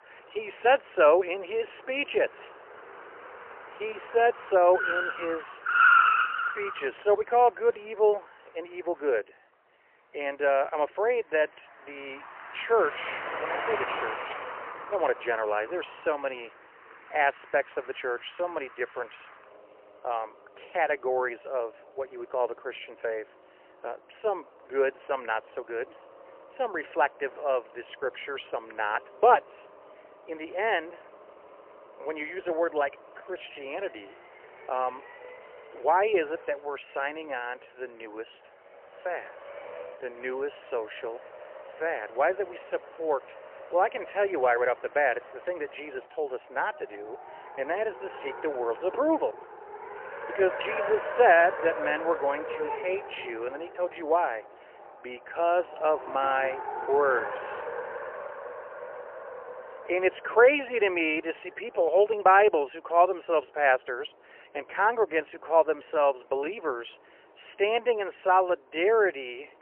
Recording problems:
phone-call audio; poor line; nothing above 3 kHz
traffic noise; loud; throughout; 5 dB below the speech

